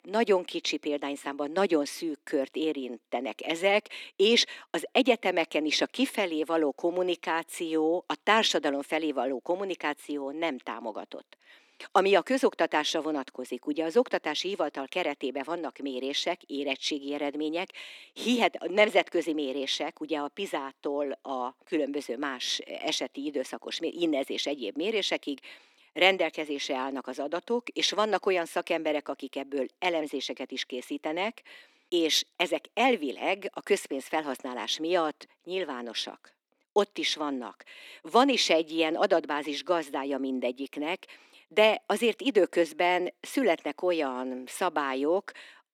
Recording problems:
thin; somewhat; fading below 250 Hz

